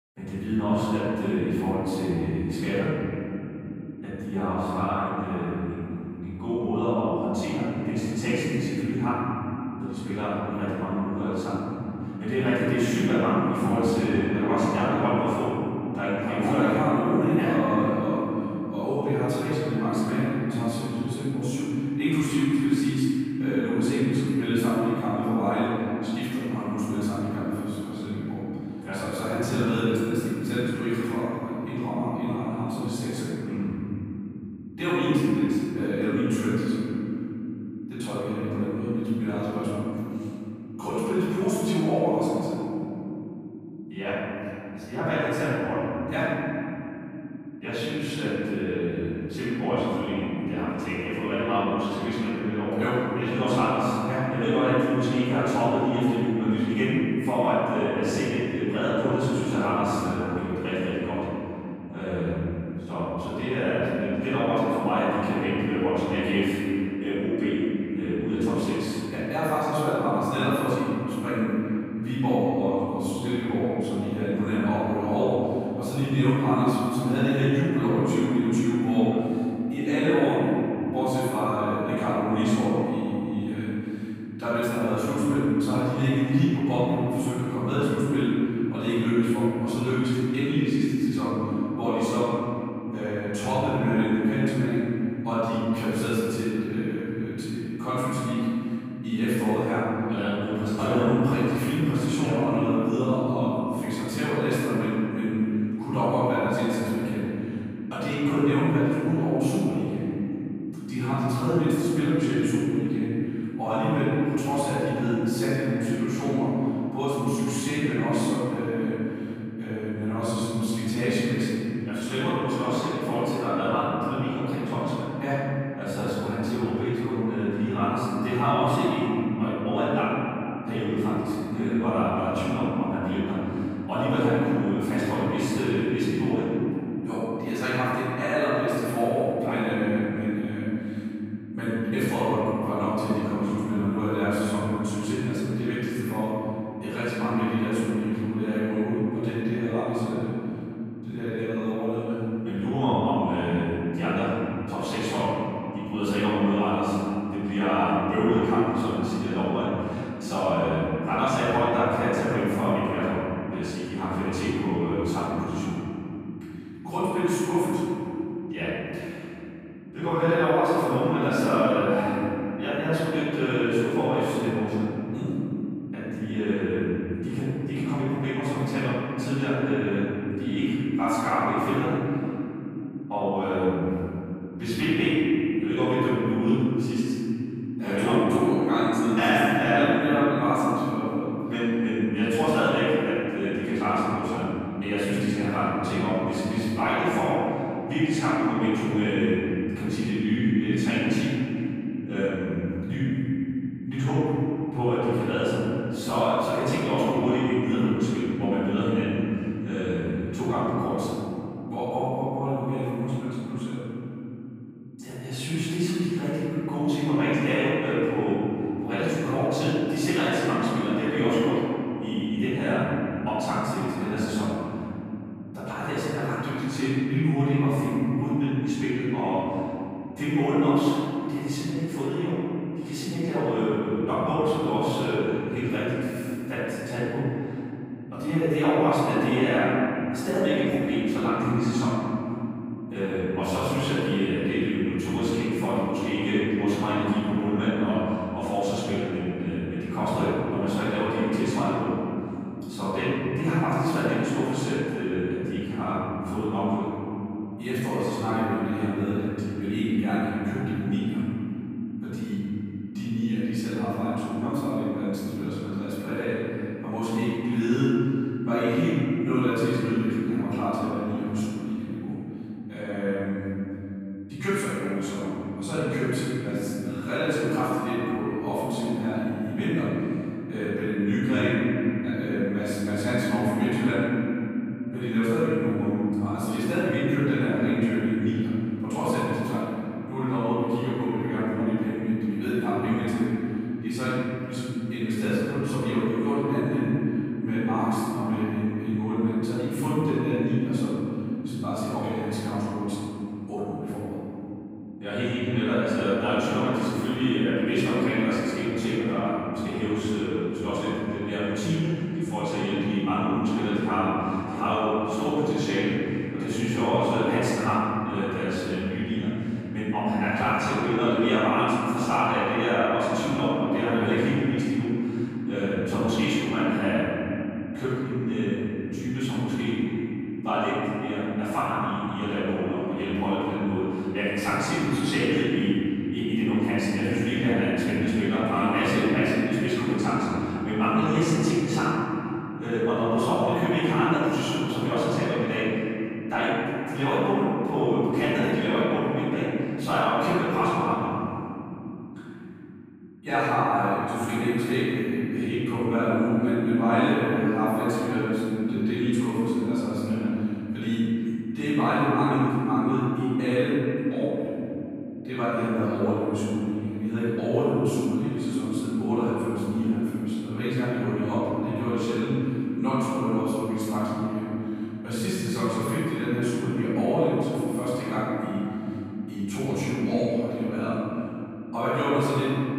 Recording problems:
room echo; strong; dies away in 3 s
off-mic speech; far

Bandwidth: 15.5 kHz